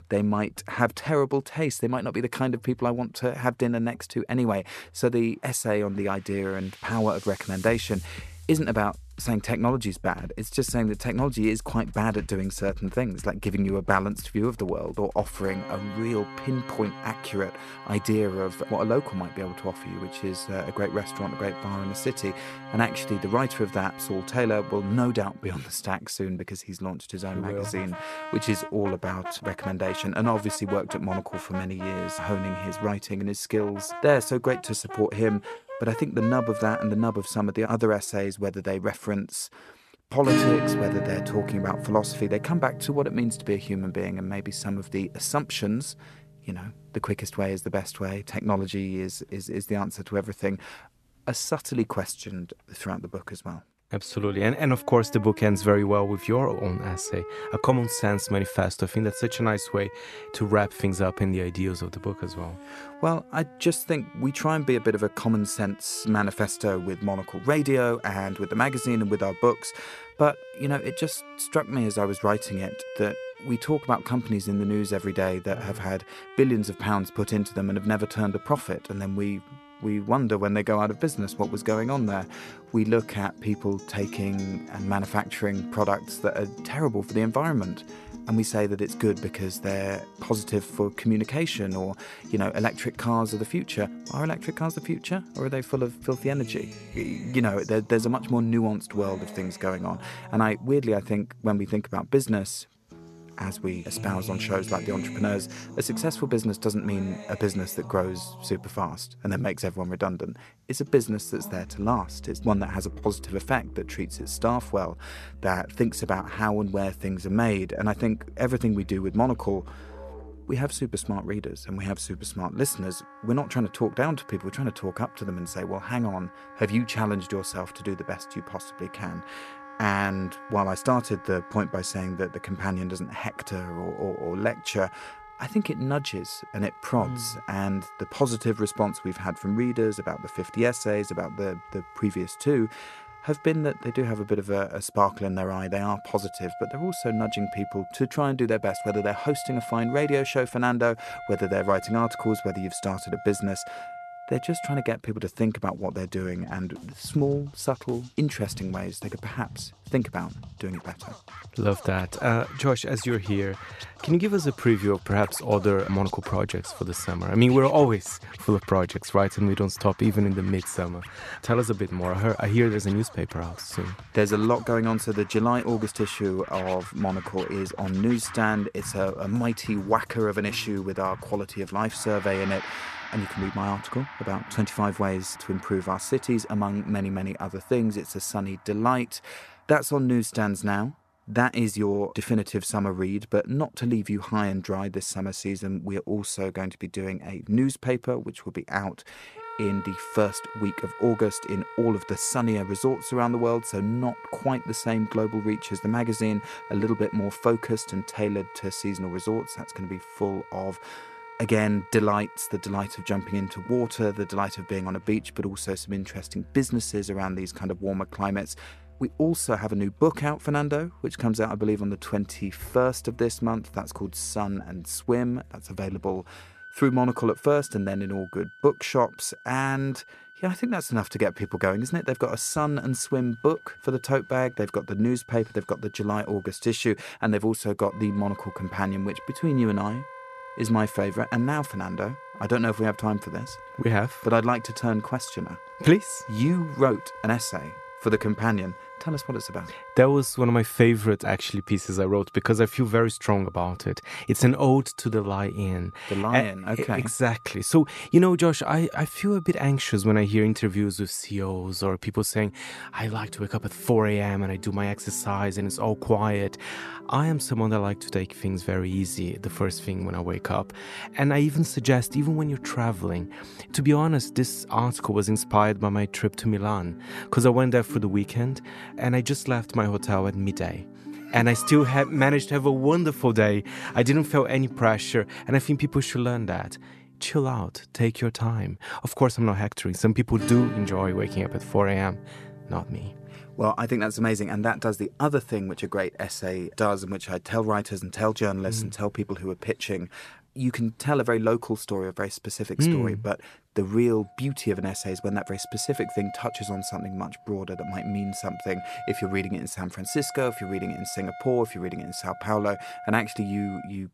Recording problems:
background music; noticeable; throughout; 15 dB below the speech

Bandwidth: 13.5 kHz